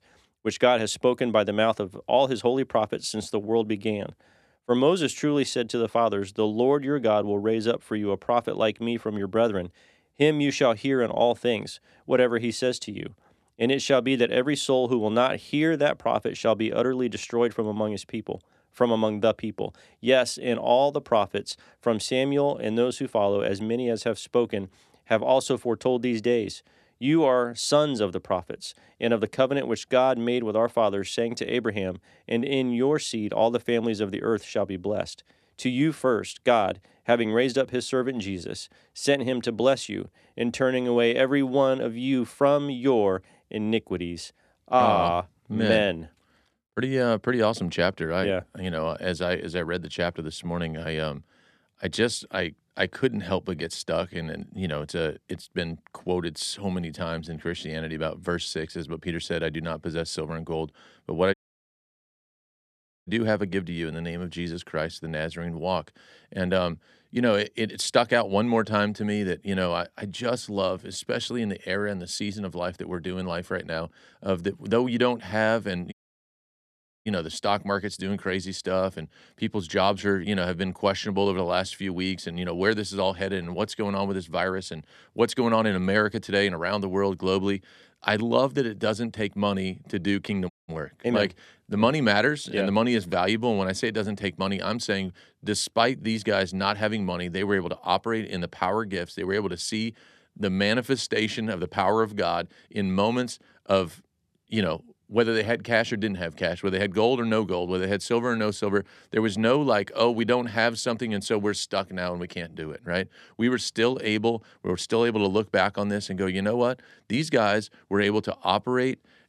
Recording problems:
audio cutting out; at 1:01 for 1.5 s, at 1:16 for 1 s and at 1:31

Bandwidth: 13.5 kHz